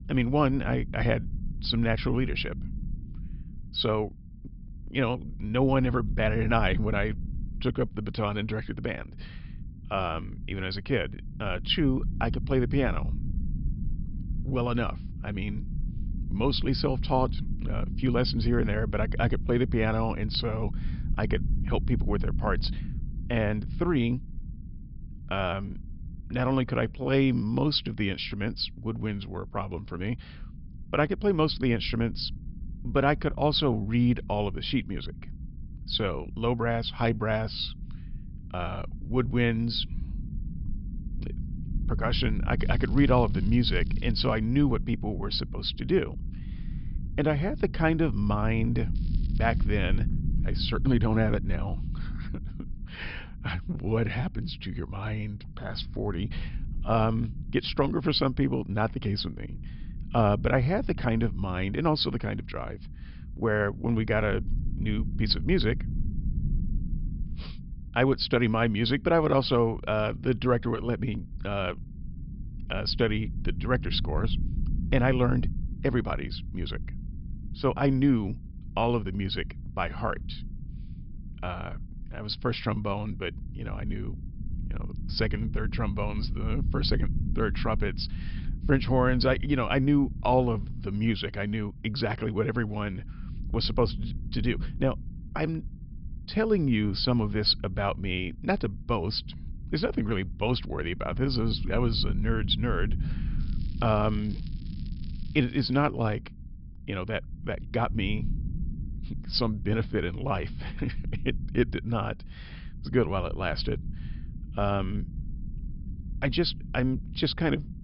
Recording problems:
high frequencies cut off; noticeable; nothing above 5.5 kHz
low rumble; noticeable; throughout; 20 dB below the speech
crackling; faint; from 43 to 44 s, at 49 s and from 1:43 to 1:46; 30 dB below the speech

